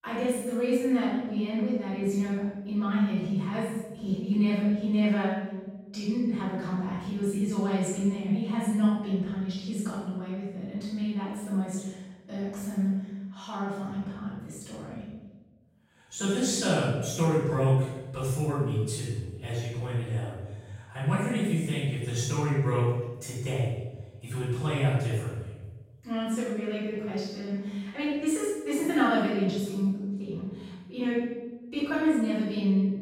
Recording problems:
room echo; strong; dies away in 1 s
off-mic speech; far

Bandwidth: 16 kHz